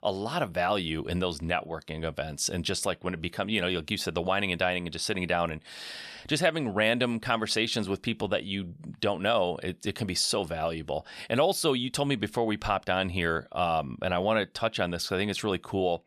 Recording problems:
none

